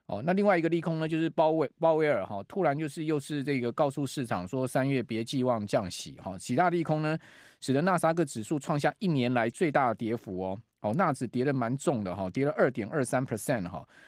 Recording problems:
garbled, watery; slightly; nothing above 15.5 kHz

